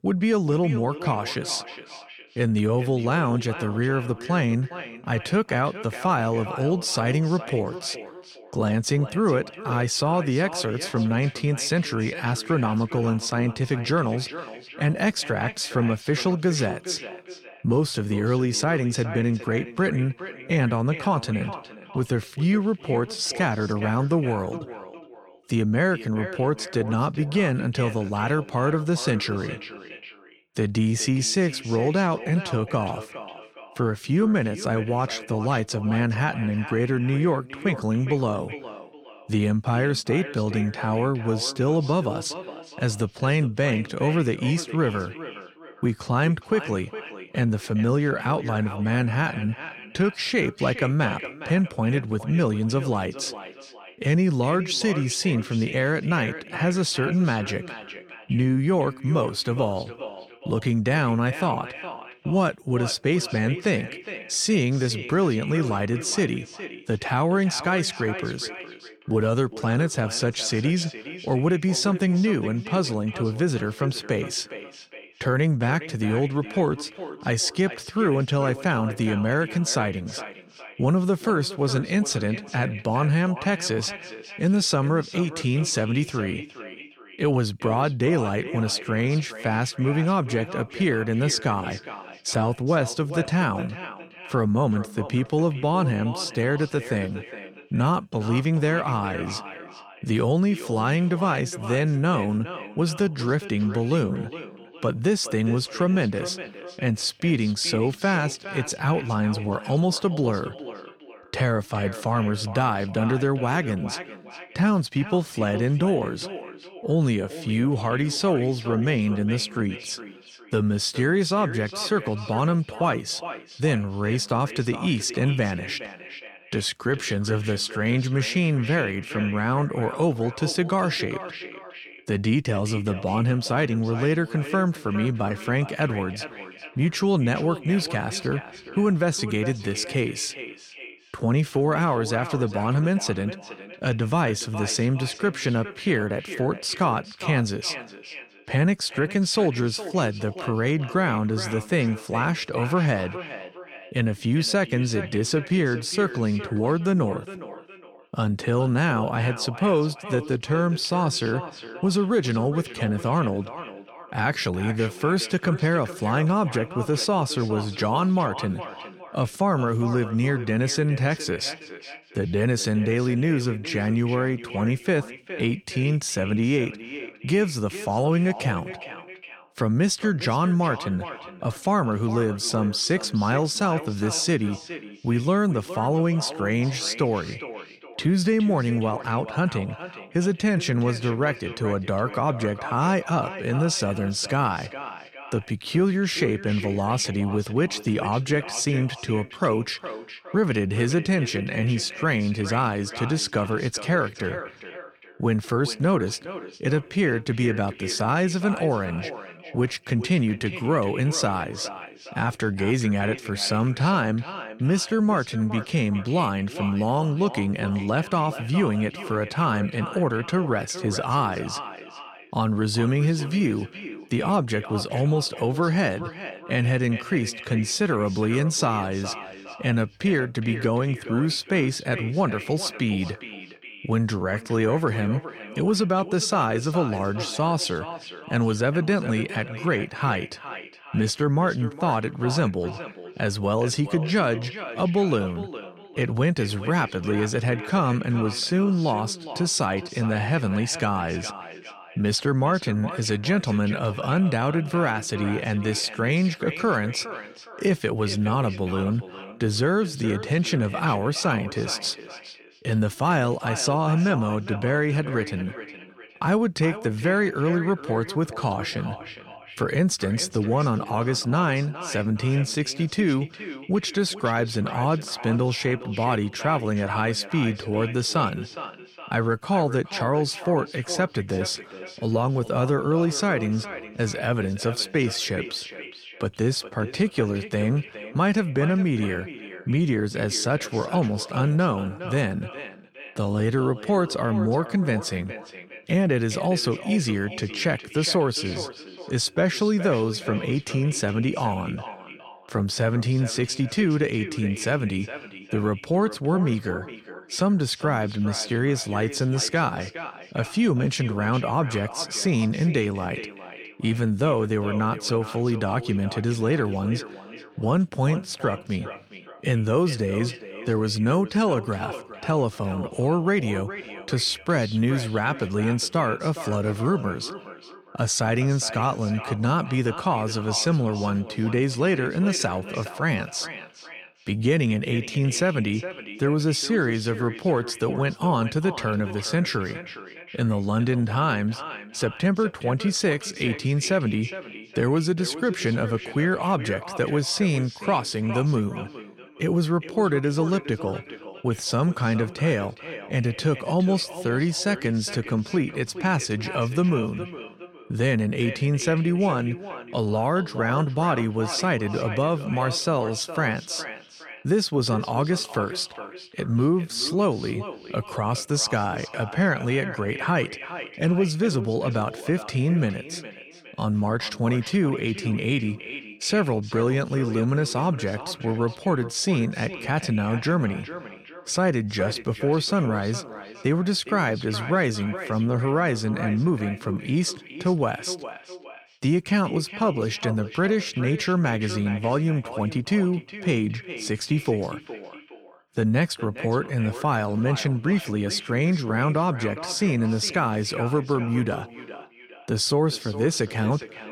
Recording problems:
echo of what is said; noticeable; throughout; 410 ms later, 15 dB below the speech

